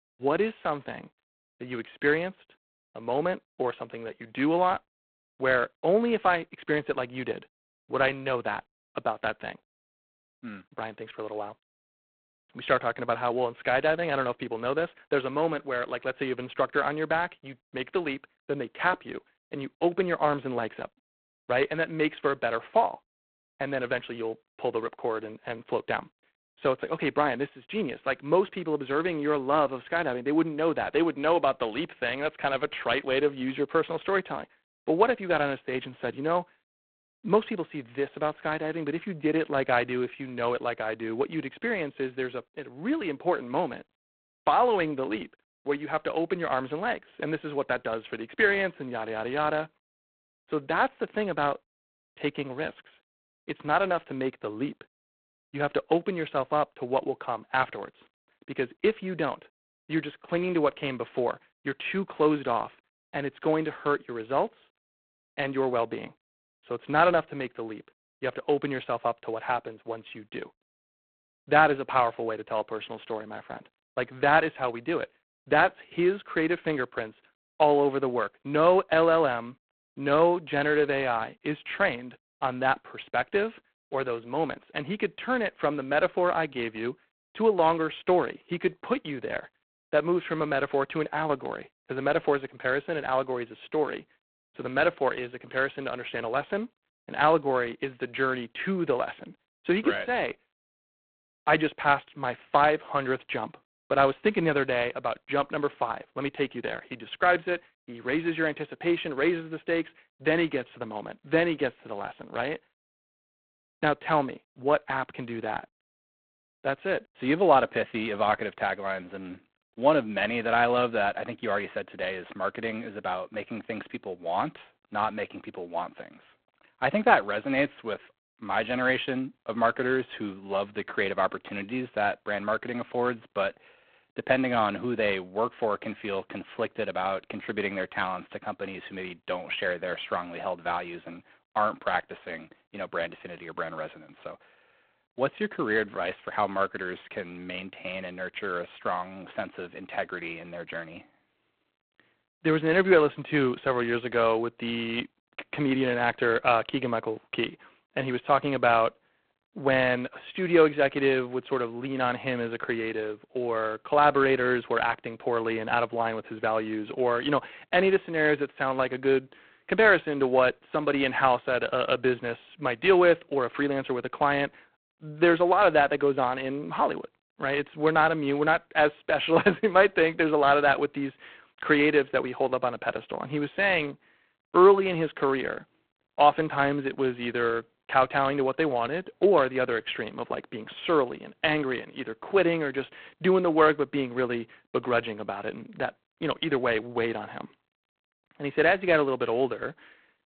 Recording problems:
phone-call audio; poor line; nothing above 4 kHz

